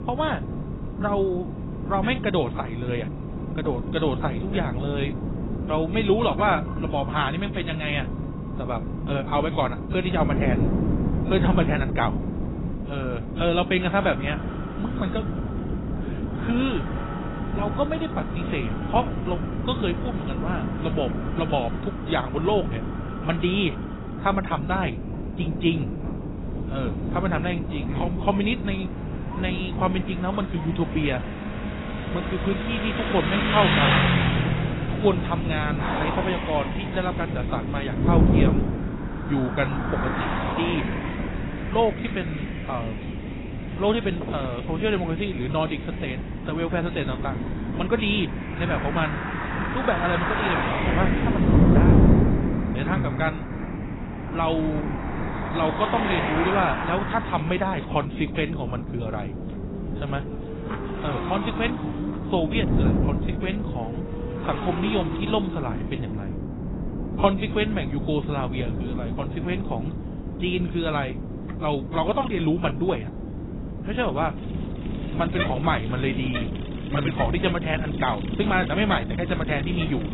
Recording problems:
garbled, watery; badly; nothing above 4 kHz
wind noise on the microphone; heavy; 8 dB below the speech
traffic noise; loud; throughout; 6 dB below the speech

